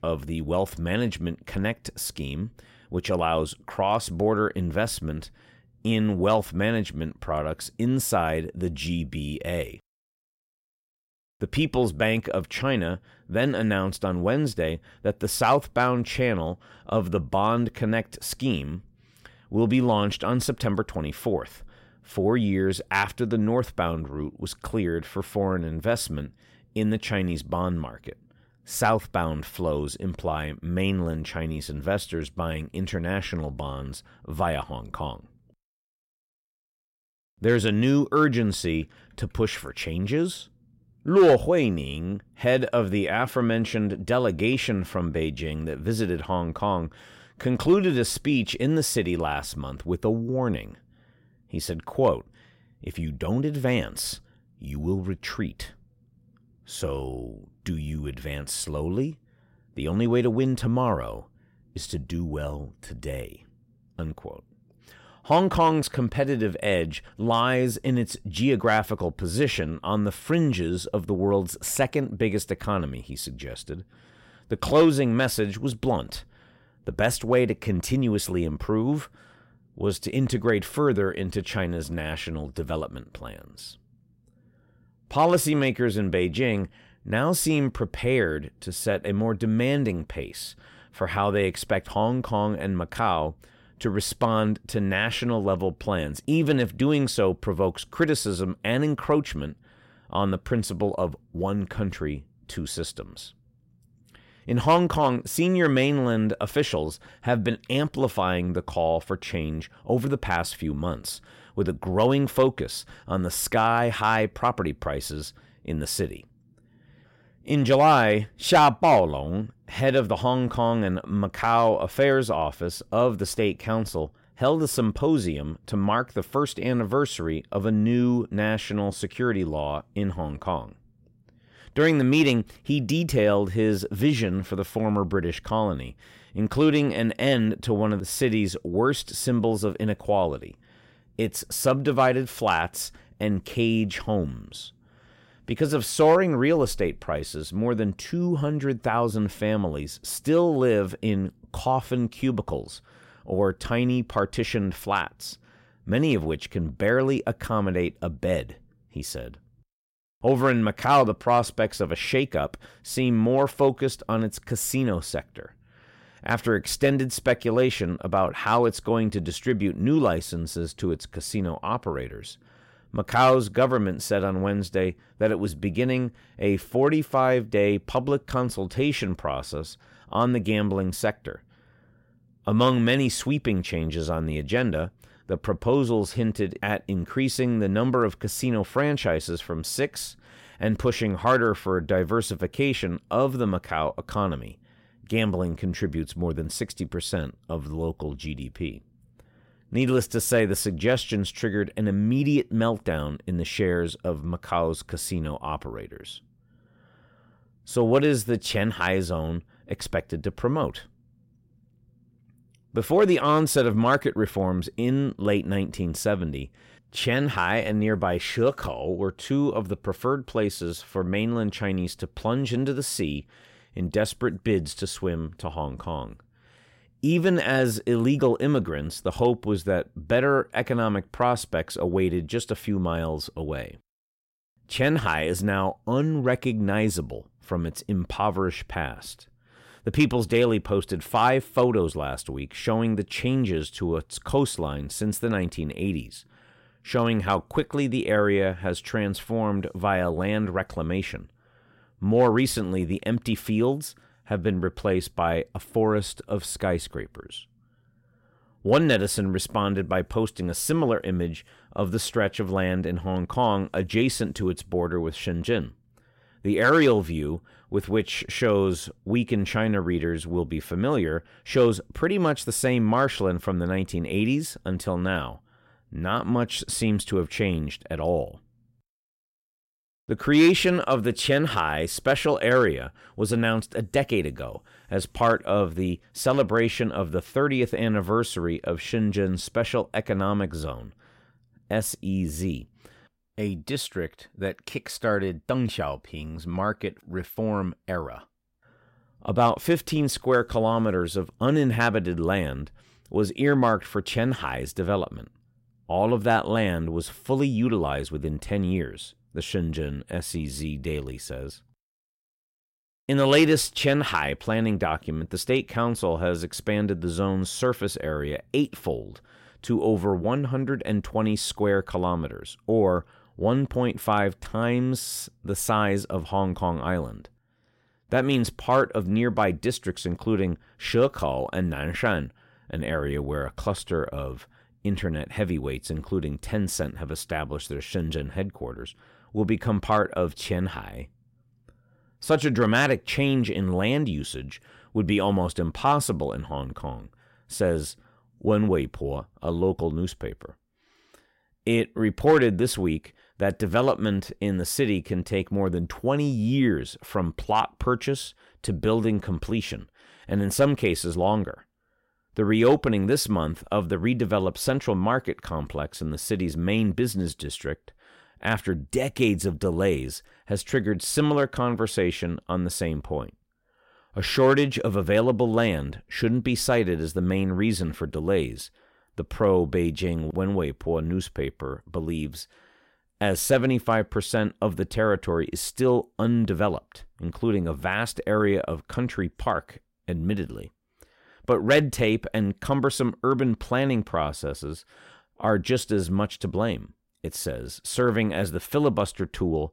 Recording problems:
none

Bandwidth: 16 kHz